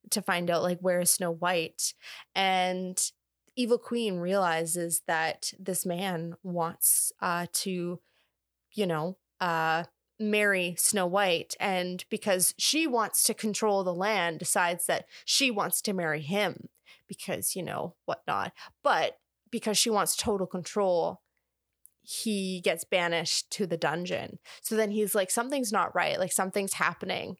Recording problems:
none

